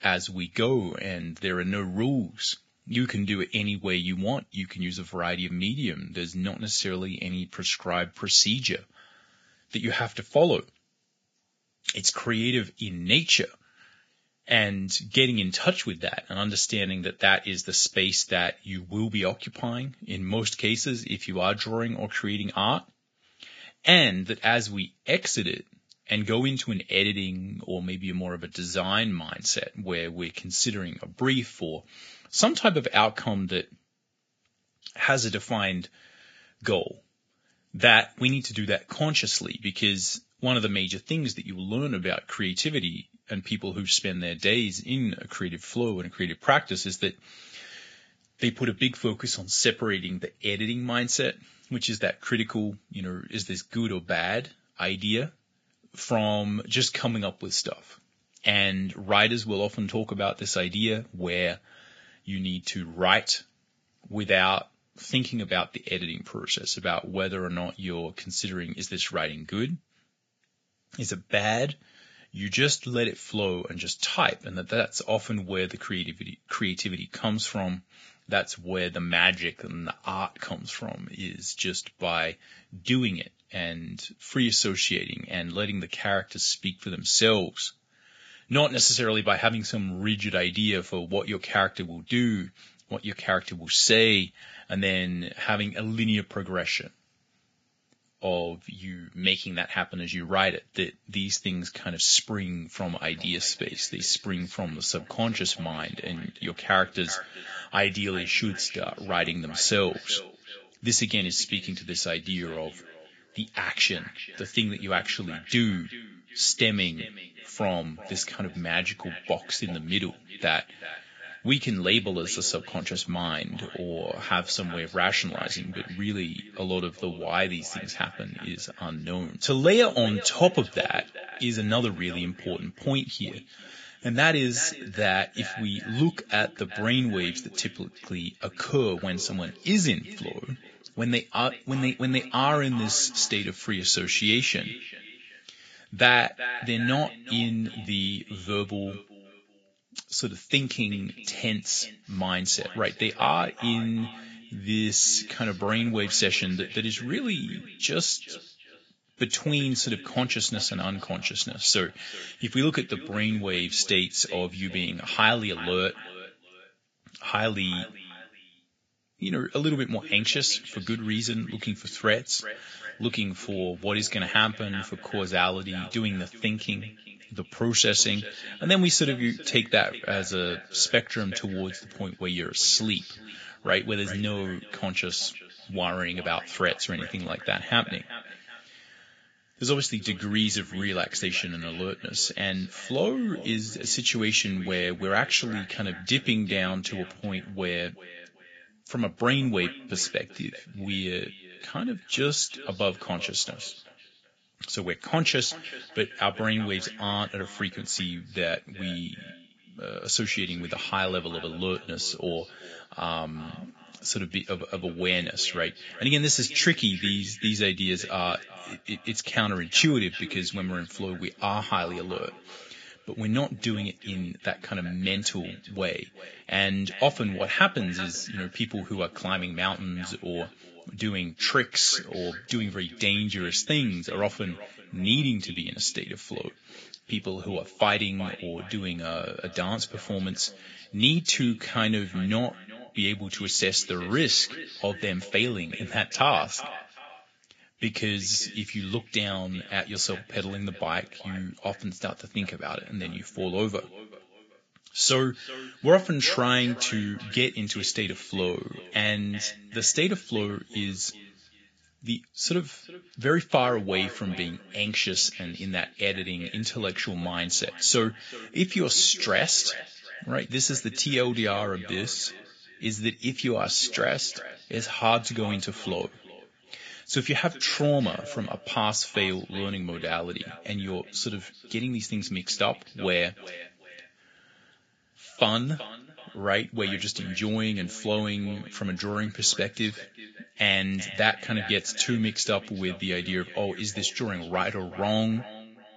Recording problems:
garbled, watery; badly; nothing above 7.5 kHz
echo of what is said; noticeable; from 1:43 on; 380 ms later, 15 dB below the speech

